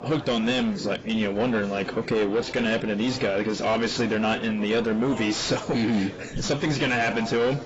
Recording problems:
distortion; heavy; 7 dB below the speech
garbled, watery; badly; nothing above 7.5 kHz
murmuring crowd; noticeable; throughout; 15 dB below the speech

